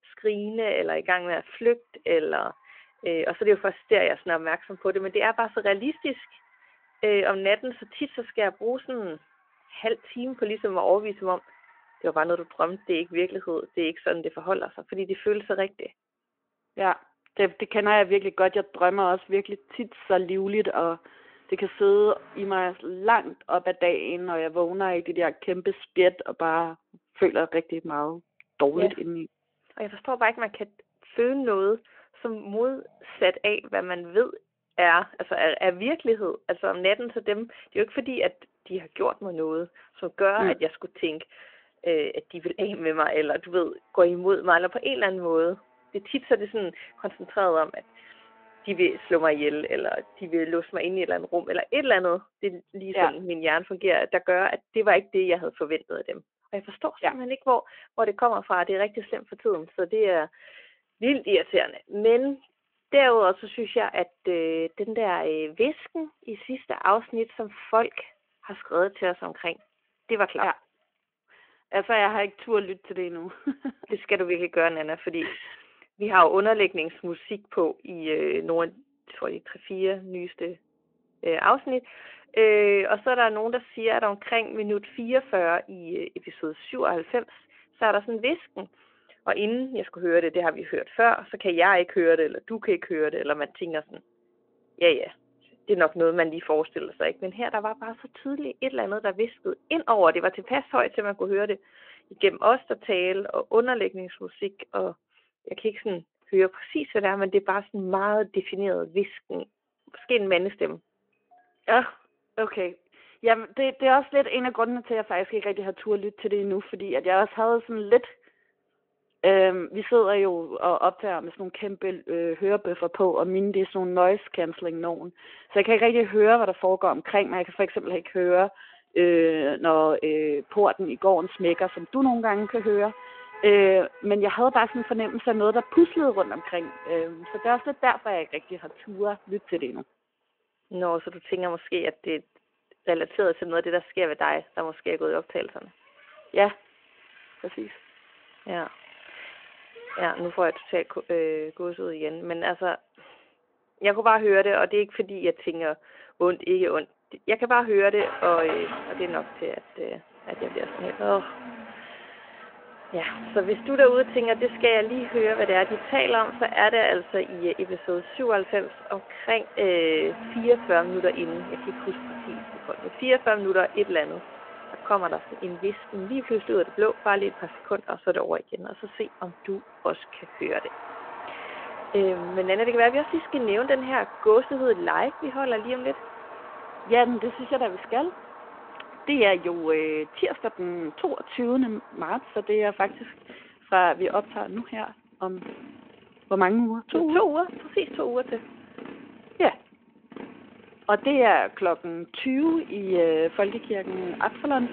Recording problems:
phone-call audio
traffic noise; noticeable; throughout; 15 dB below the speech

